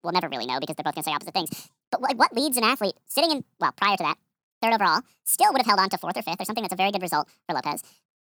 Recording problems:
wrong speed and pitch; too fast and too high; 1.7 times normal speed

